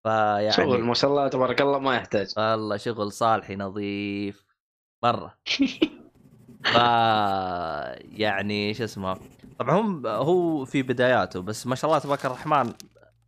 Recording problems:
household noises; faint; from 5.5 s on; 25 dB below the speech

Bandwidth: 14.5 kHz